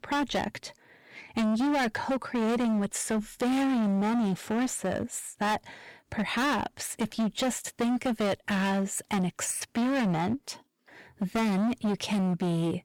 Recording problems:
distortion; heavy; 24% of the sound clipped

